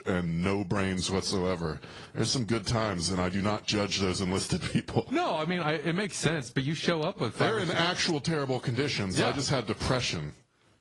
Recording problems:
garbled, watery; slightly
squashed, flat; somewhat

